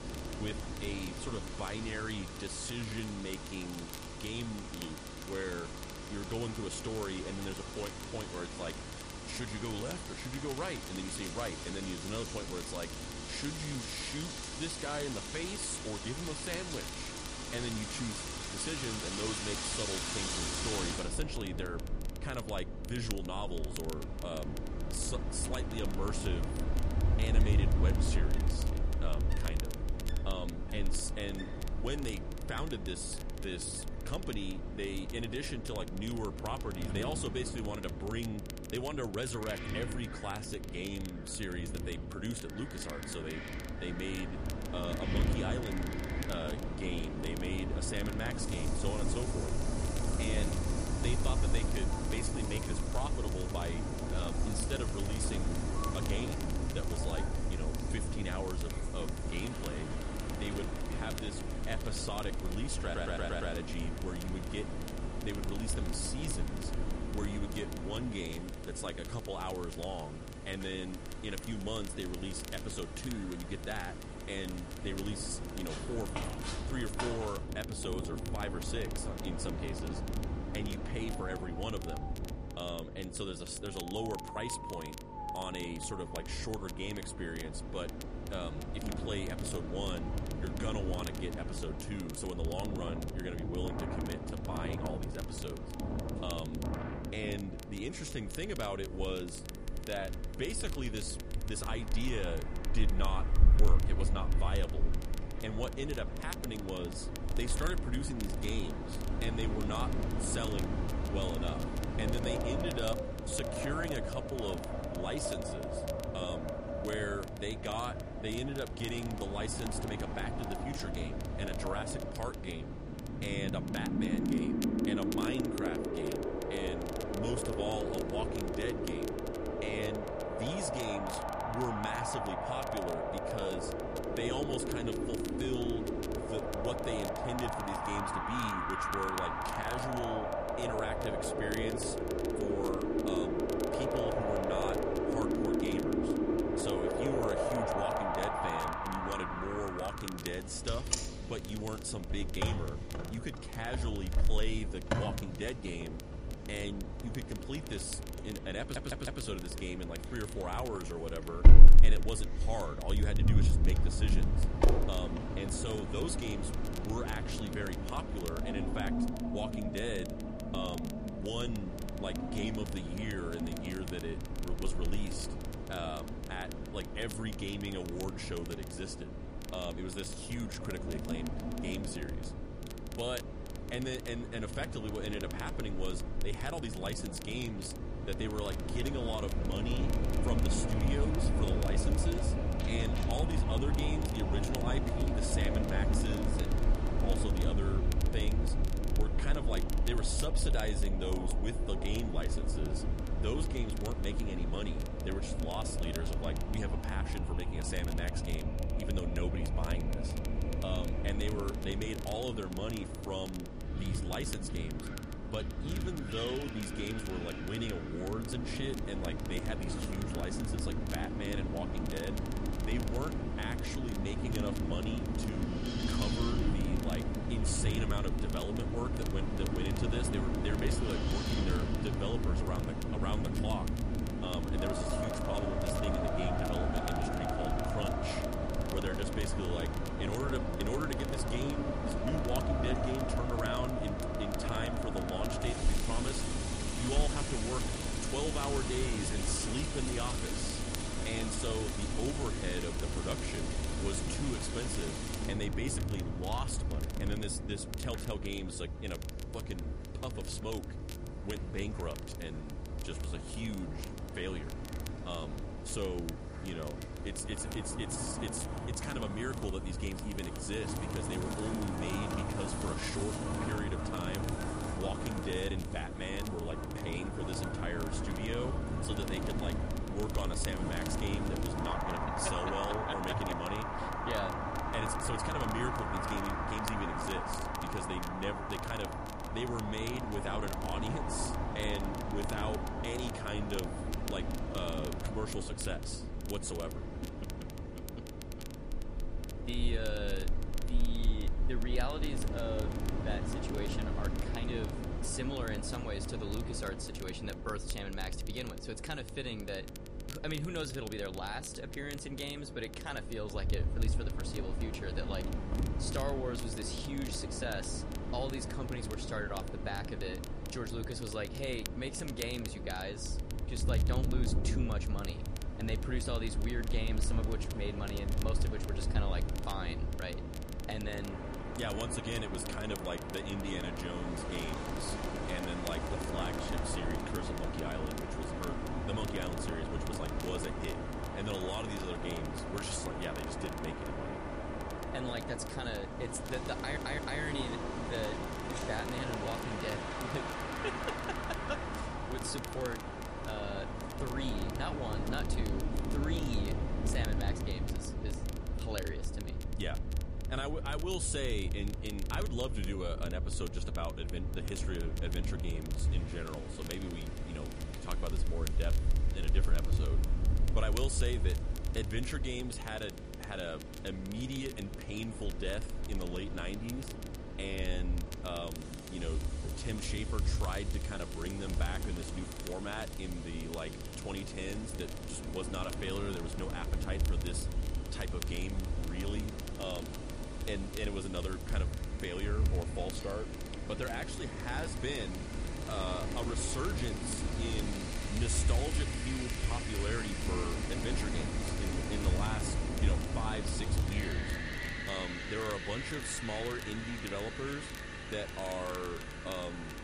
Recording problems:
garbled, watery; slightly; nothing above 10.5 kHz
wind in the background; very loud; throughout; 3 dB above the speech
electrical hum; noticeable; throughout; 50 Hz, 10 dB below the speech
crackle, like an old record; noticeable; 10 dB below the speech
audio stuttering; at 1:03, at 2:39 and at 5:47

